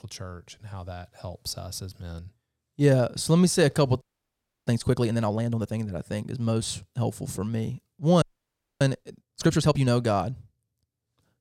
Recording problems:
audio freezing; at 4 s for 0.5 s and at 8 s for 0.5 s

